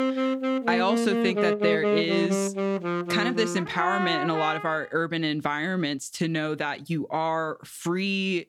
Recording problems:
background music; very loud; until 4.5 s; as loud as the speech

